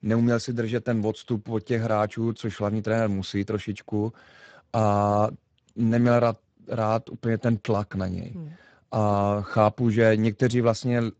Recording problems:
garbled, watery; badly; nothing above 7.5 kHz

